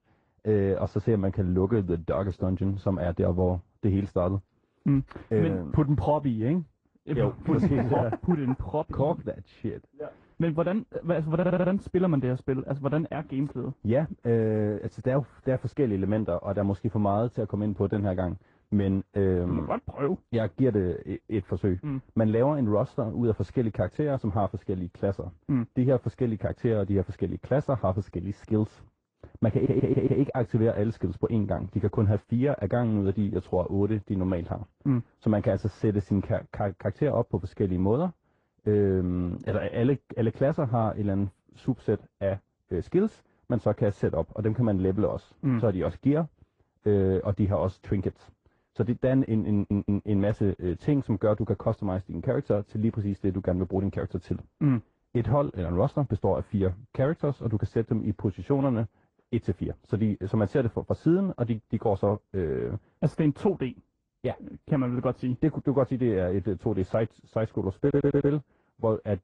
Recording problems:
muffled; very; fading above 1.5 kHz
garbled, watery; slightly
audio stuttering; 4 times, first at 11 s

